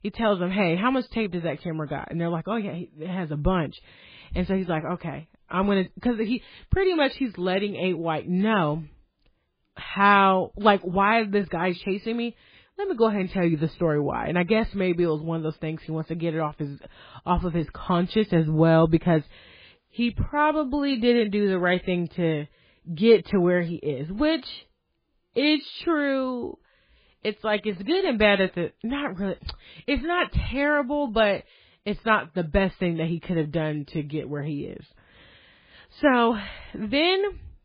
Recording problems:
garbled, watery; badly; nothing above 4 kHz

